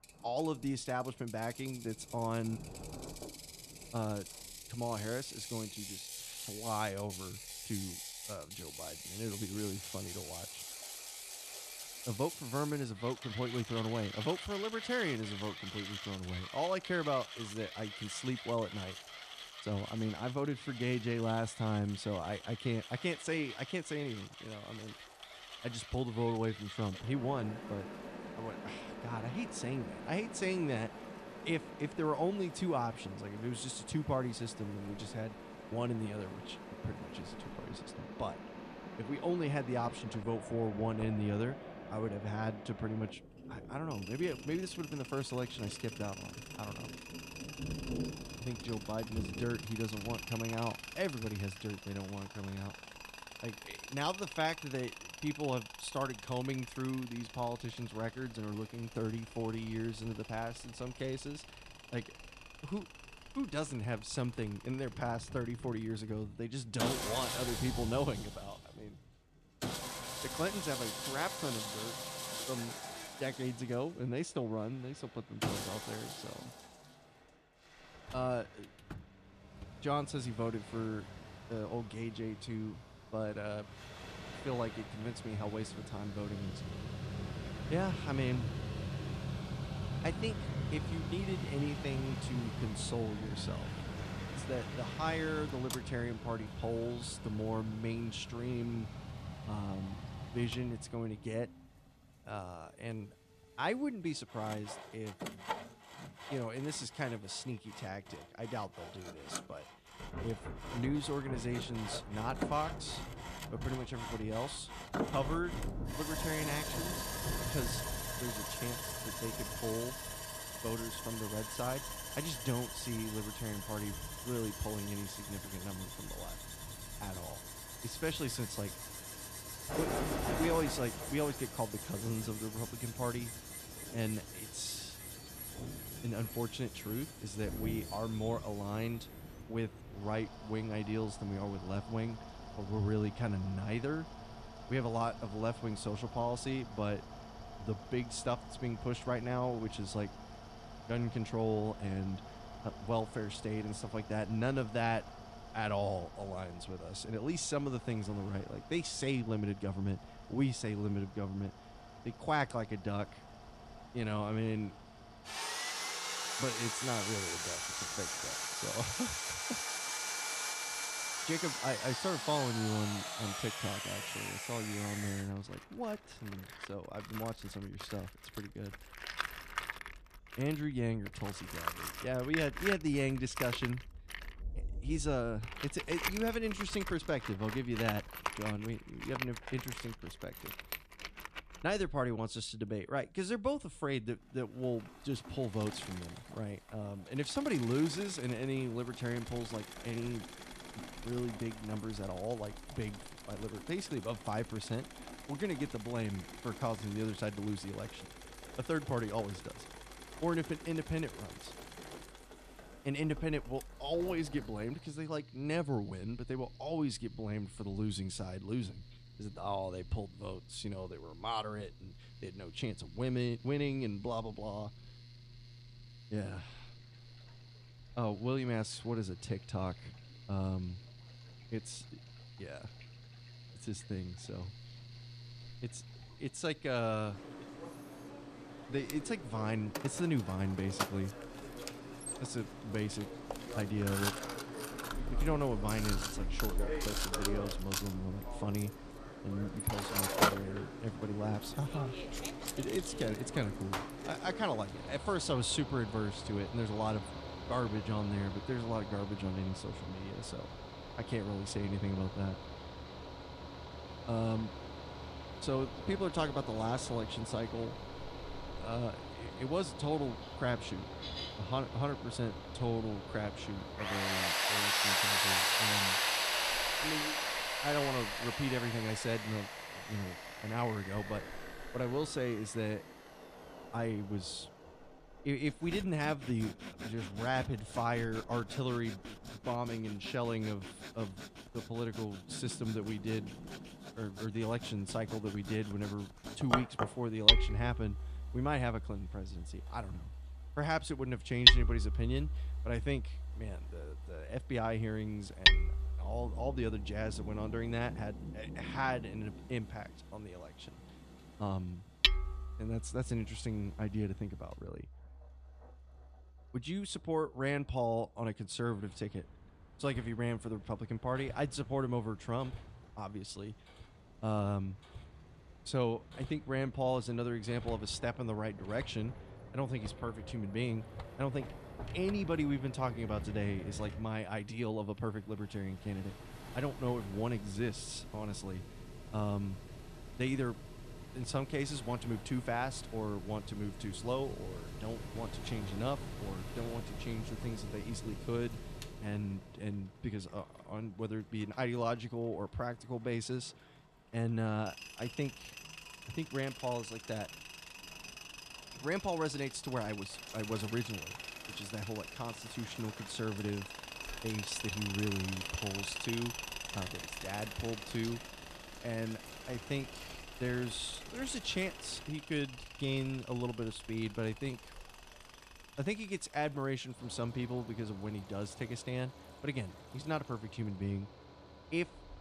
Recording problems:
machinery noise; loud; throughout; 2 dB below the speech
rain or running water; noticeable; throughout; 15 dB below the speech

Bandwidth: 14.5 kHz